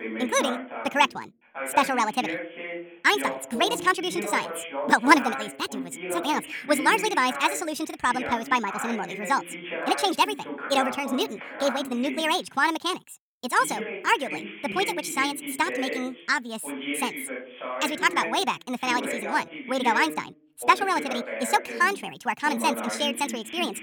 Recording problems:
wrong speed and pitch; too fast and too high; 1.6 times normal speed
voice in the background; loud; throughout; 8 dB below the speech

